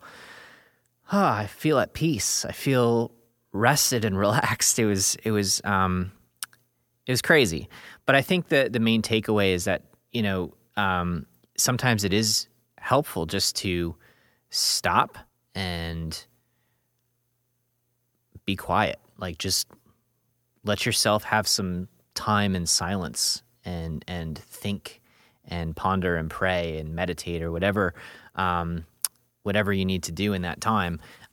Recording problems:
none

